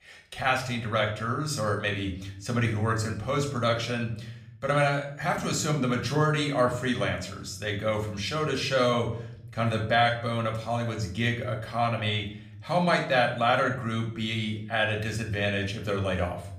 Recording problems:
room echo; slight; dies away in 0.6 s
off-mic speech; somewhat distant

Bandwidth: 15 kHz